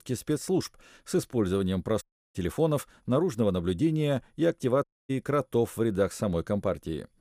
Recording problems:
audio cutting out; at 2 s and at 5 s

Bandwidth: 15 kHz